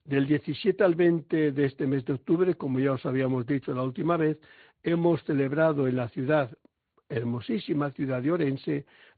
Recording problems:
high frequencies cut off; severe; nothing above 4.5 kHz
garbled, watery; slightly

